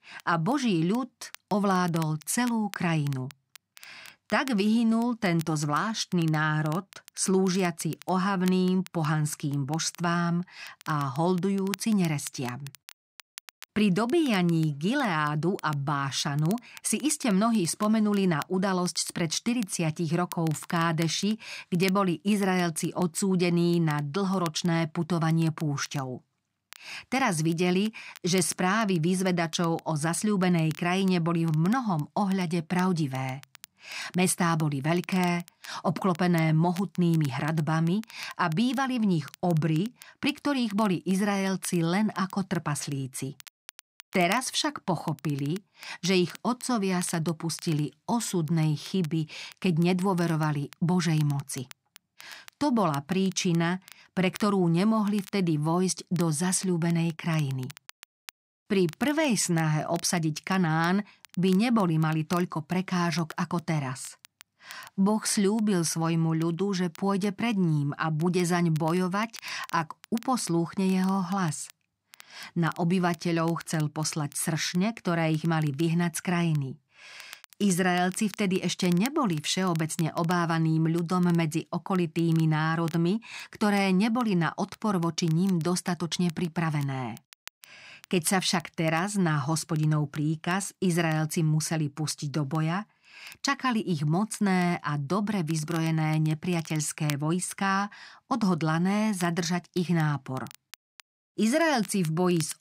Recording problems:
crackle, like an old record; faint; 20 dB below the speech

